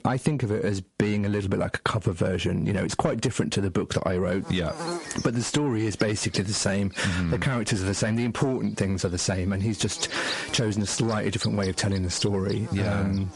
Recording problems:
distortion; slight; 10 dB below the speech
garbled, watery; slightly; nothing above 11 kHz
squashed, flat; somewhat
electrical hum; loud; from 4.5 s on; 50 Hz, 9 dB below the speech

